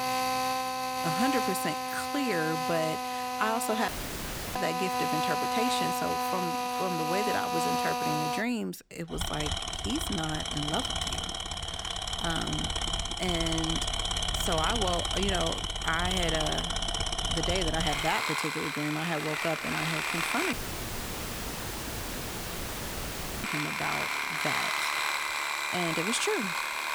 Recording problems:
machinery noise; very loud; throughout; 3 dB above the speech
audio cutting out; at 4 s for 0.5 s and at 21 s for 3 s

